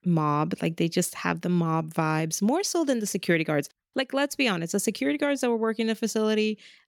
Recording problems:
none

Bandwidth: 17.5 kHz